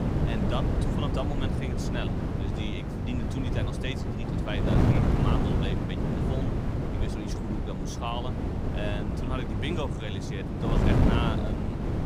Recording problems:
wind noise on the microphone; heavy; 2 dB above the speech

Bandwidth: 15.5 kHz